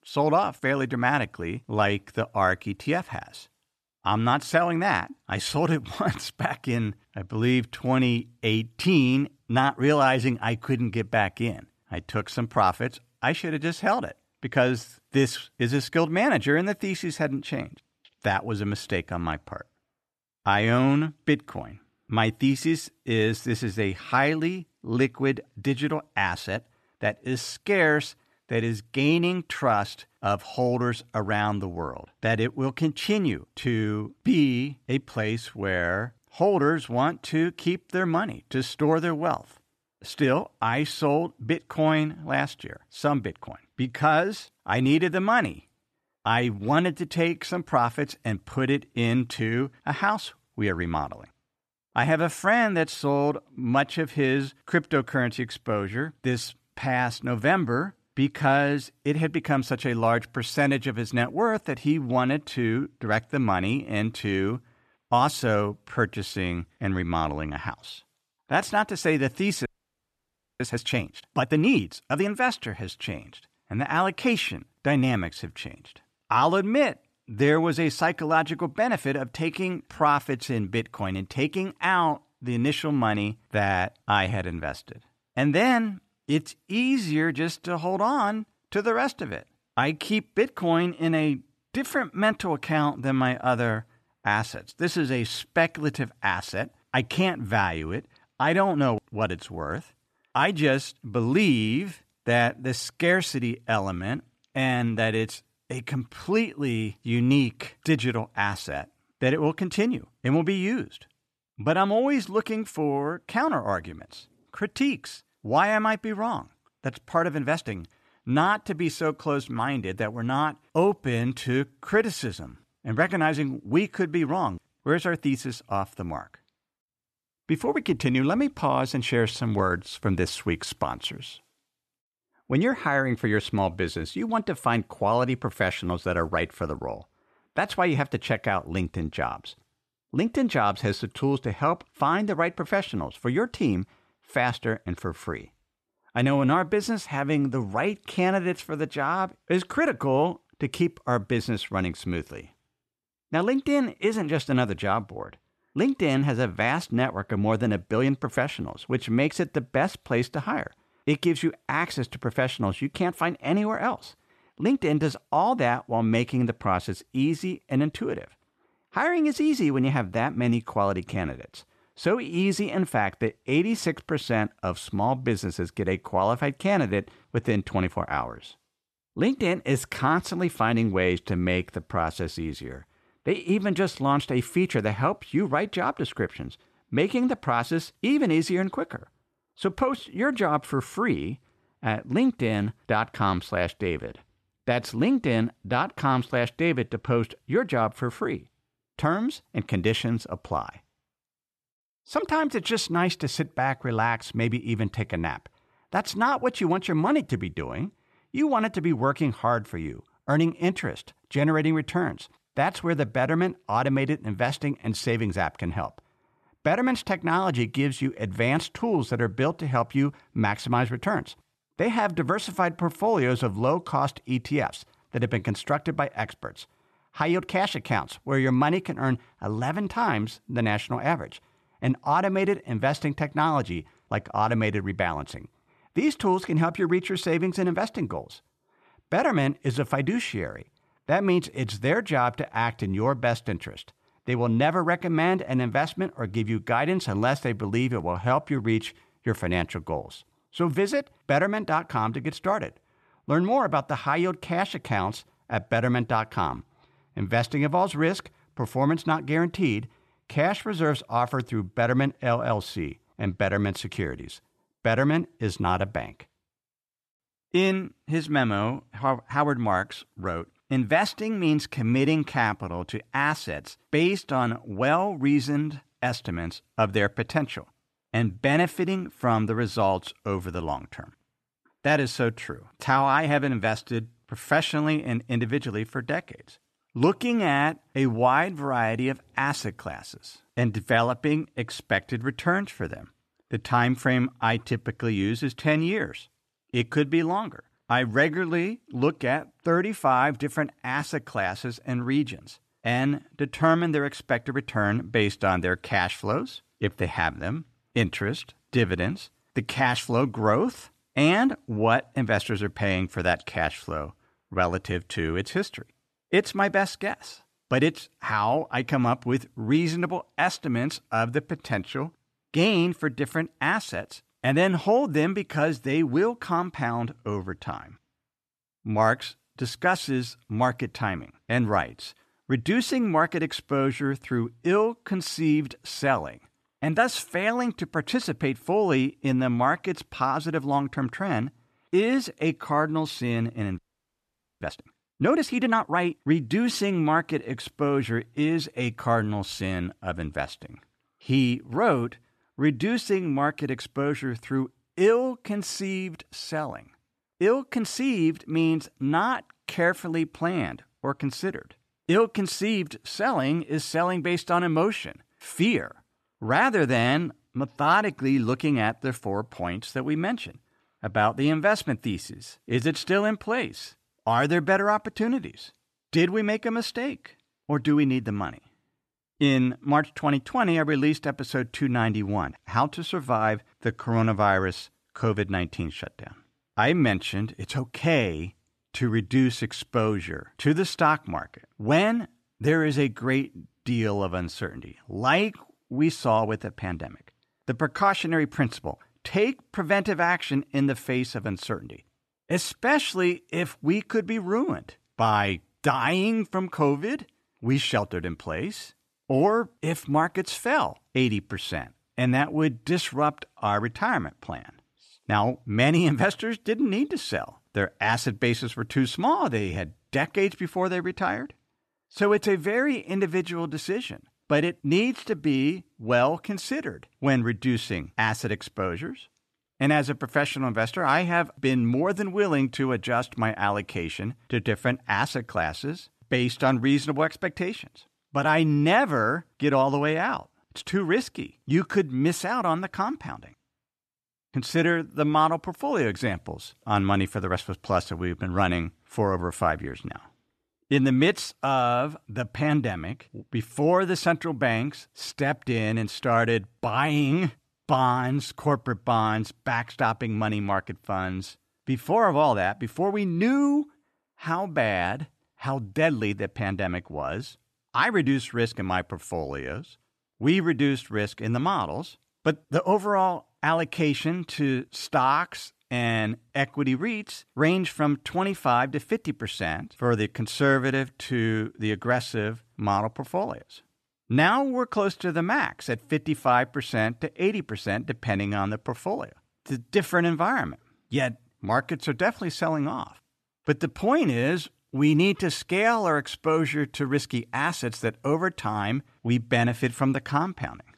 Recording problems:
audio freezing; at 1:10 for 1 s and at 5:44 for 1 s

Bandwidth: 13.5 kHz